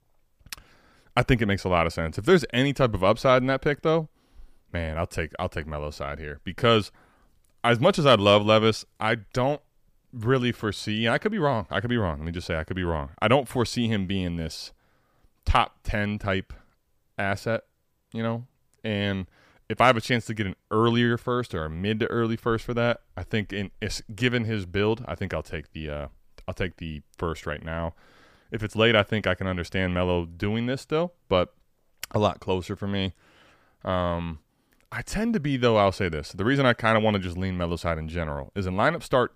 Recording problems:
none

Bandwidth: 15 kHz